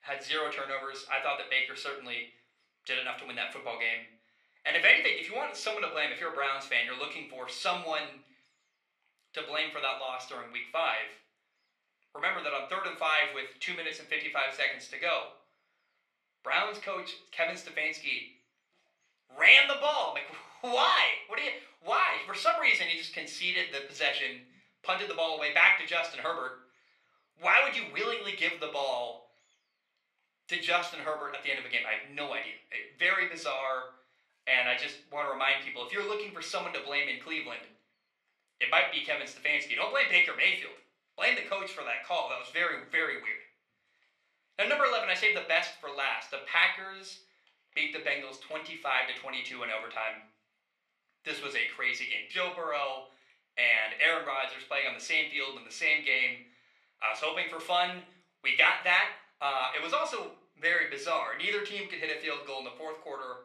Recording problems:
thin; very; fading below 450 Hz
room echo; slight; dies away in 0.4 s
off-mic speech; somewhat distant

